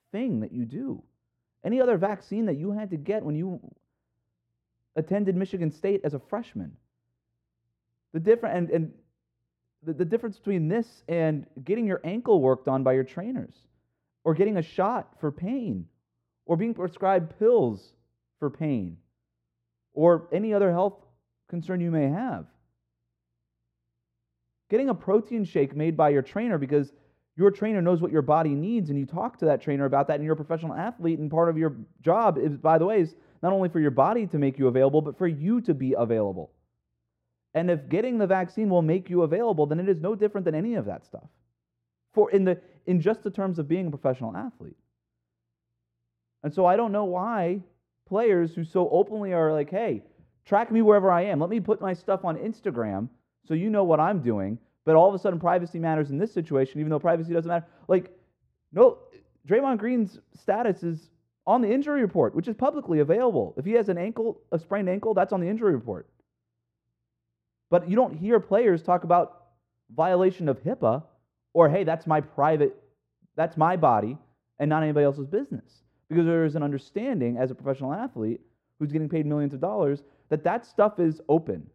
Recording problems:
muffled; very; fading above 2 kHz

